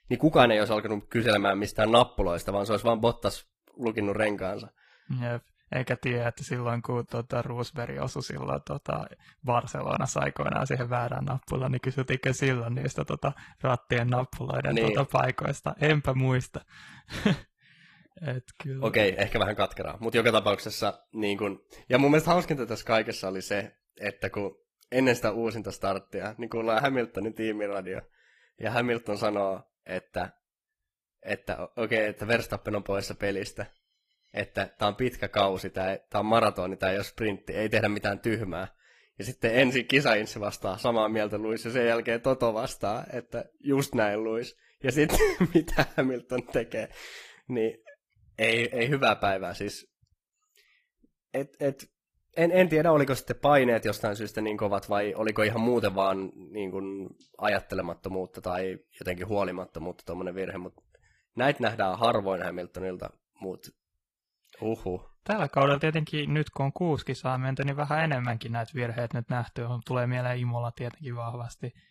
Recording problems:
garbled, watery; slightly; nothing above 15 kHz

